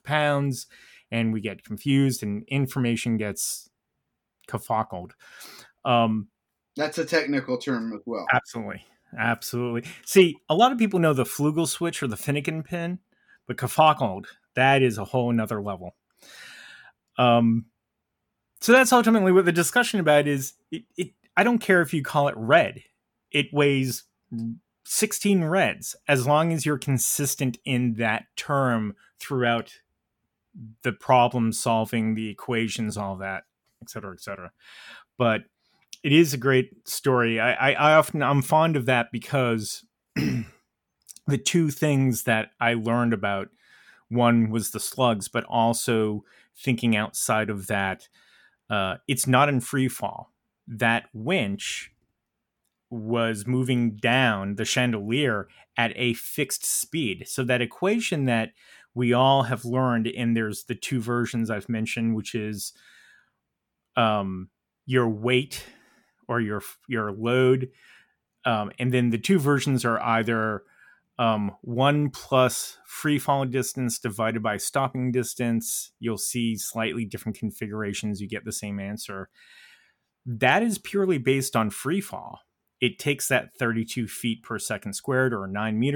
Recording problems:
abrupt cut into speech; at the end

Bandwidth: 18 kHz